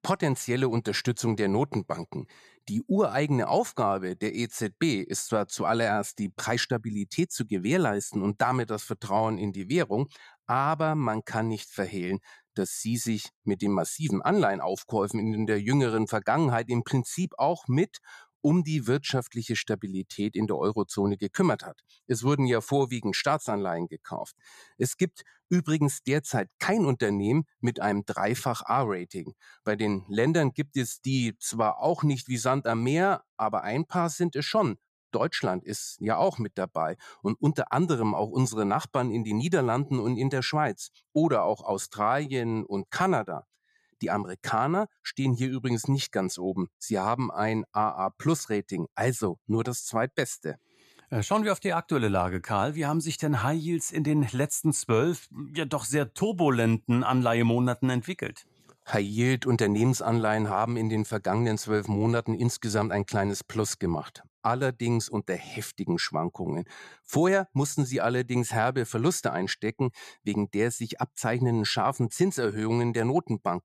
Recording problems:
none

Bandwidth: 14.5 kHz